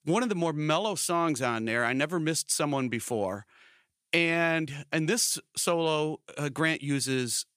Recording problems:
none

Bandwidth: 15 kHz